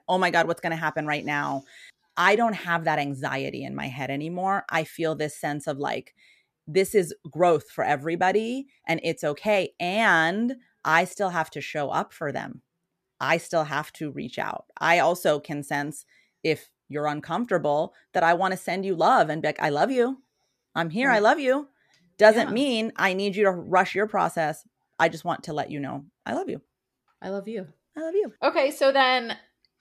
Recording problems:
none

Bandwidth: 14.5 kHz